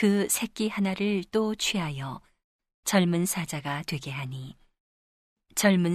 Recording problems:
abrupt cut into speech; at the start and the end

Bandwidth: 13.5 kHz